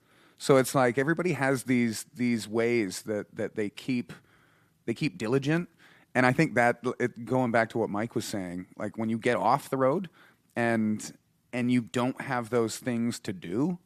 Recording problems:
uneven, jittery; strongly; from 1 to 12 s

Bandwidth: 14.5 kHz